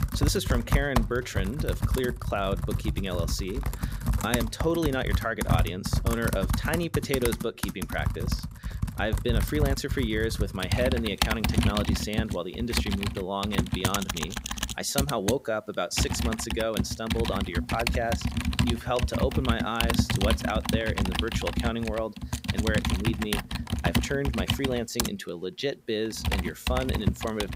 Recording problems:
household noises; very loud; throughout; 1 dB above the speech

